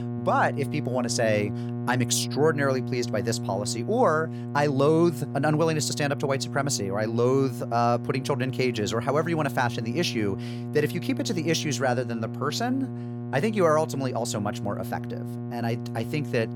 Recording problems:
electrical hum; noticeable; throughout; 60 Hz, 15 dB below the speech

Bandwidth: 17 kHz